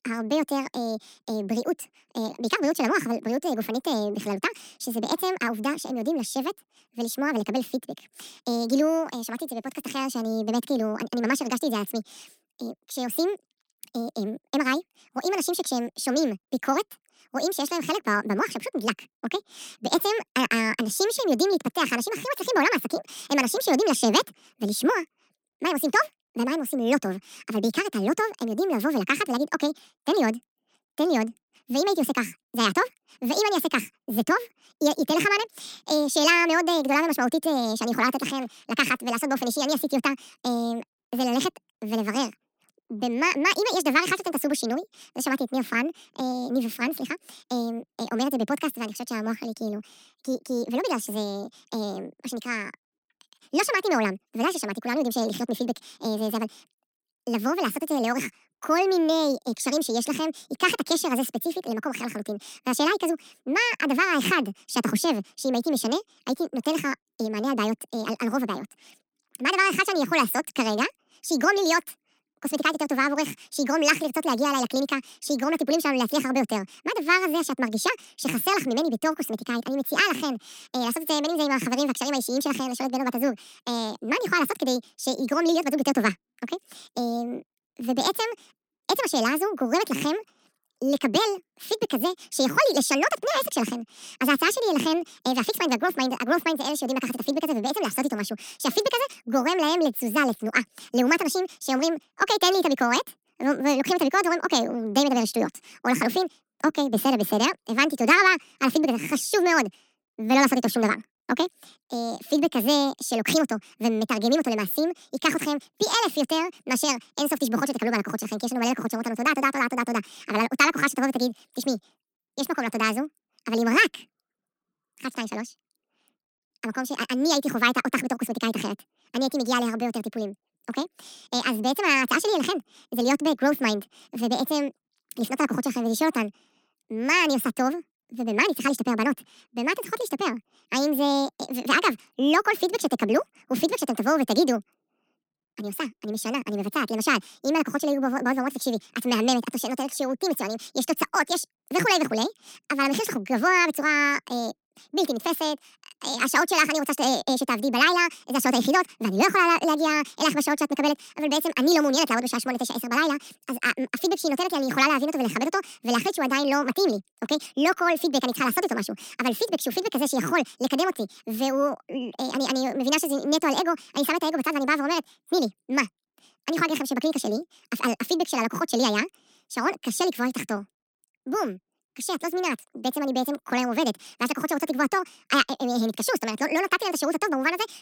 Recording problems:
wrong speed and pitch; too fast and too high; 1.6 times normal speed

